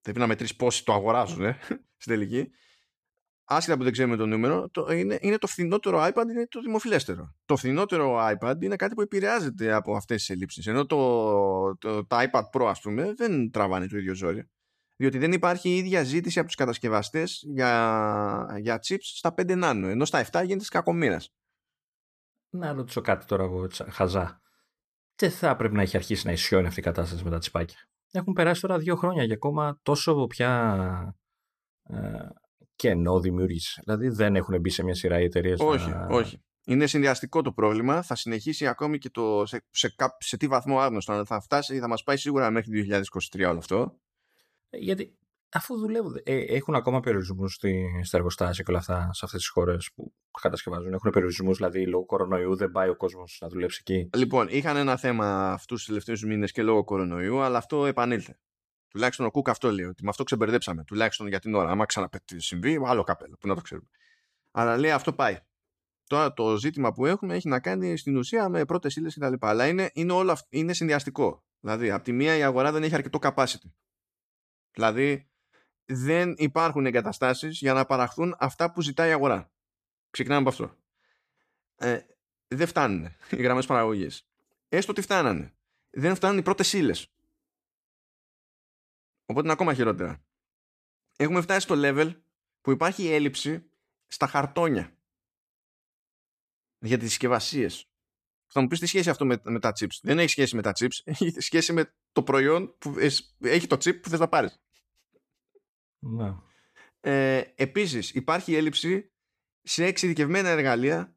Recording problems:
none

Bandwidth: 14.5 kHz